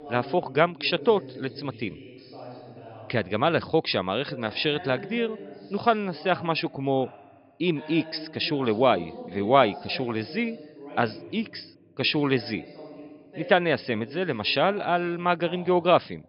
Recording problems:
high frequencies cut off; noticeable; nothing above 5.5 kHz
voice in the background; noticeable; throughout; 15 dB below the speech

